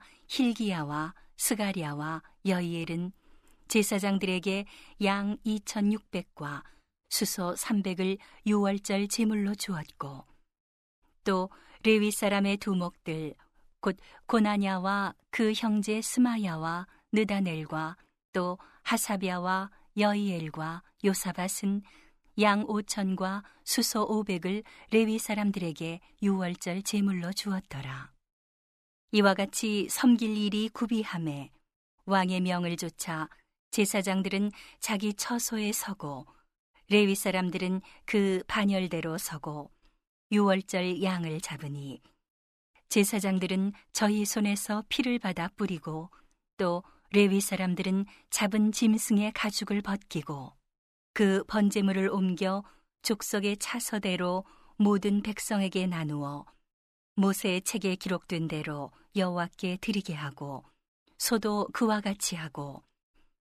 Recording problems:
none

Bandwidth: 14.5 kHz